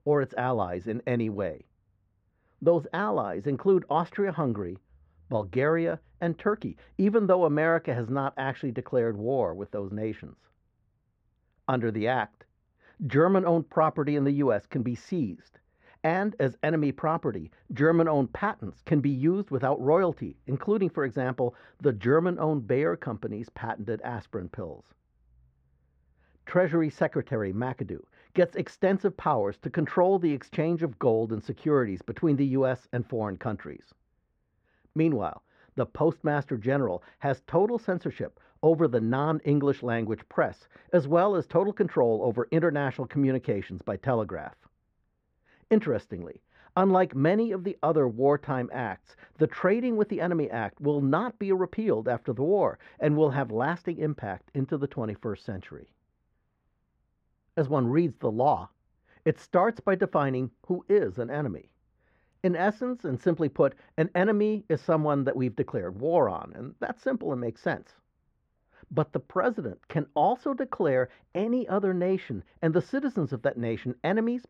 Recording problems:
muffled; very; fading above 4 kHz

